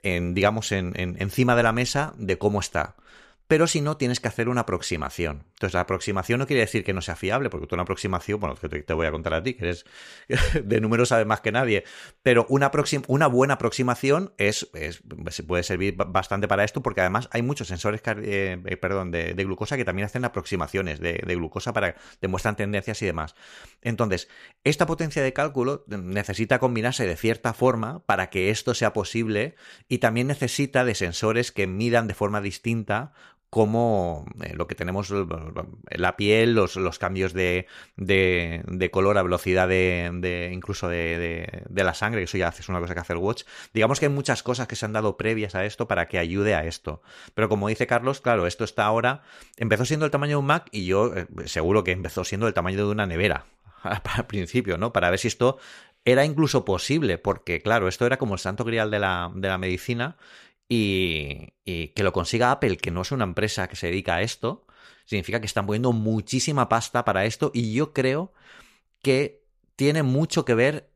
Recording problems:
none

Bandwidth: 14.5 kHz